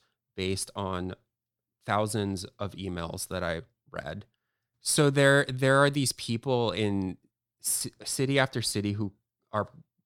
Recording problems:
none

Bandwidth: 18.5 kHz